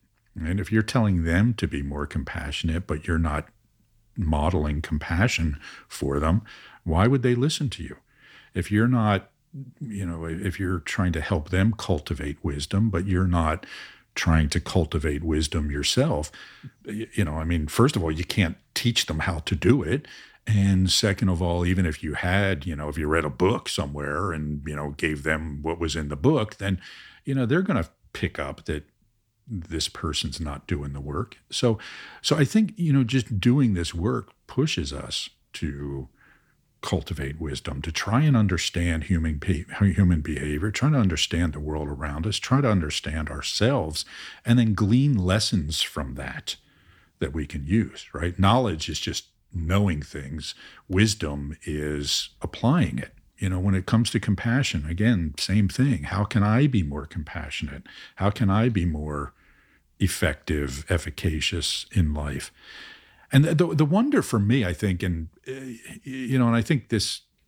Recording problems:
none

